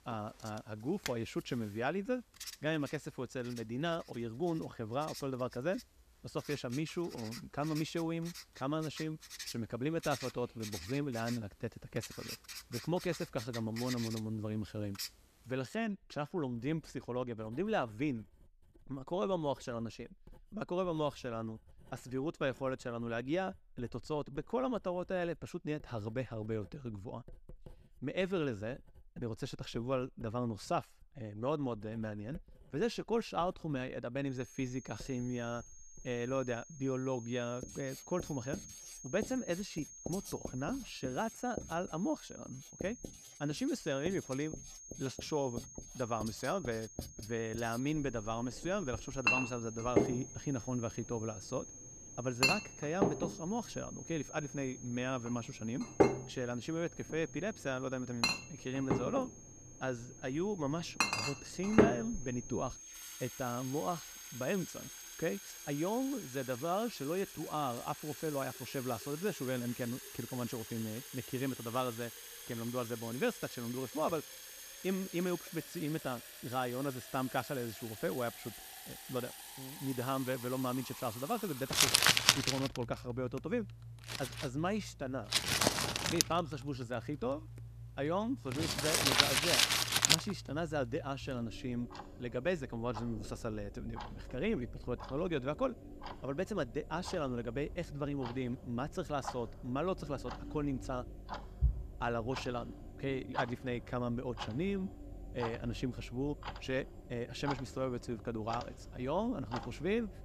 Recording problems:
household noises; very loud; throughout; 1 dB above the speech
high-pitched whine; noticeable; from 34 s to 1:15; 6.5 kHz, 15 dB below the speech

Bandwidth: 14.5 kHz